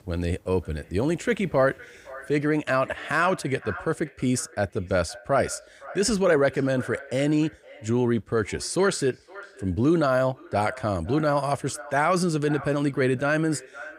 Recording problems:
echo of what is said; faint; throughout; 510 ms later, 20 dB below the speech

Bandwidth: 15.5 kHz